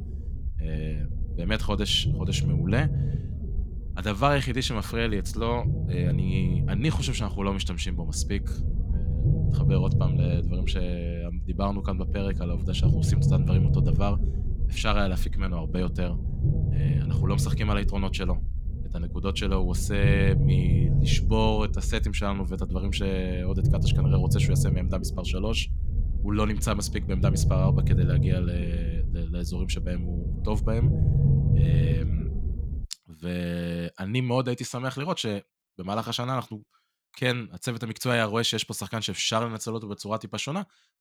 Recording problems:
low rumble; loud; until 33 s; 8 dB below the speech

